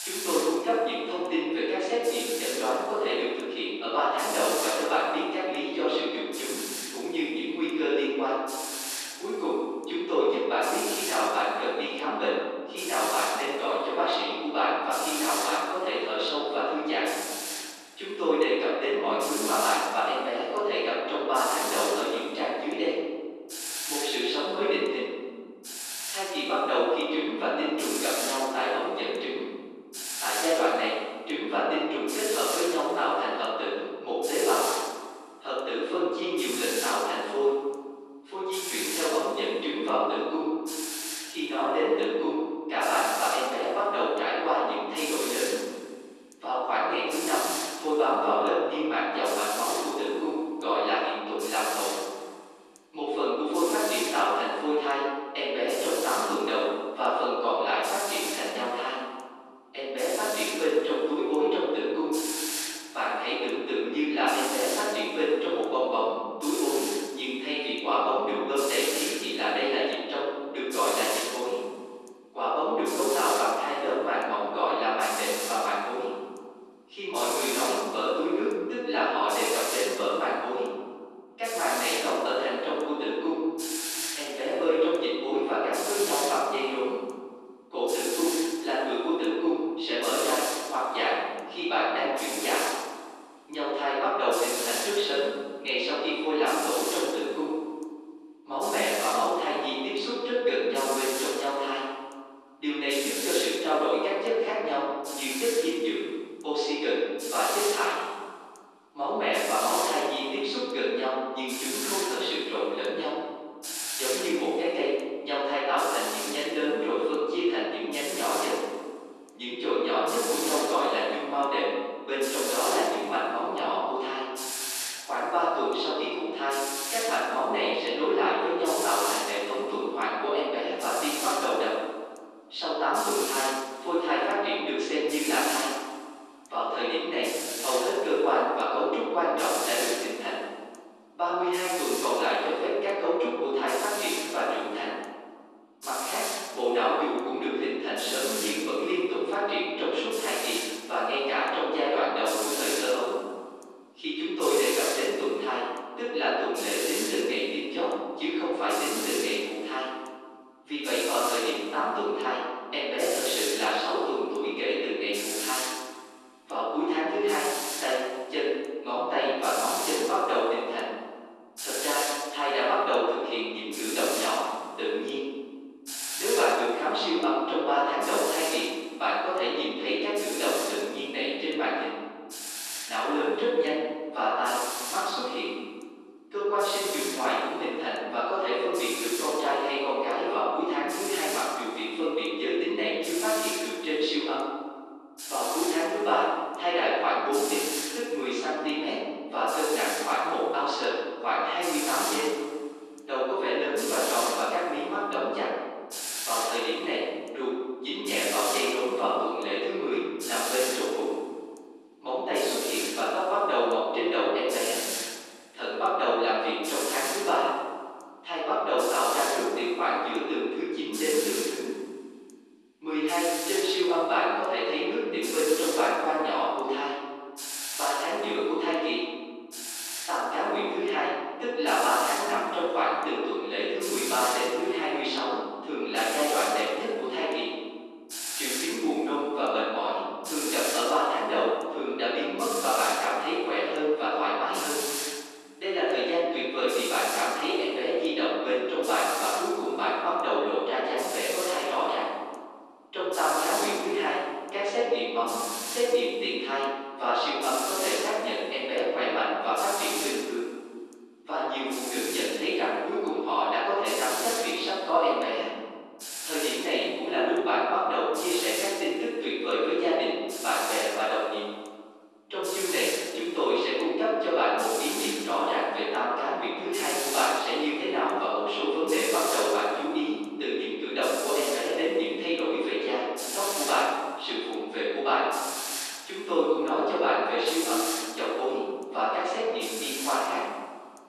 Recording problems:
room echo; strong; dies away in 1.6 s
off-mic speech; far
thin; somewhat; fading below 300 Hz
hiss; loud; throughout; 6 dB below the speech

